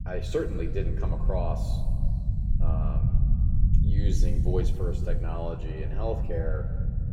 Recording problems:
room echo; slight; dies away in 1.9 s
off-mic speech; somewhat distant
low rumble; loud; throughout; 8 dB below the speech

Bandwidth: 16.5 kHz